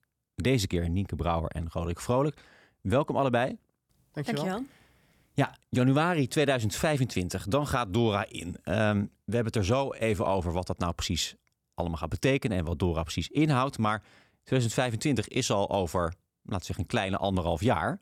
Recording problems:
none

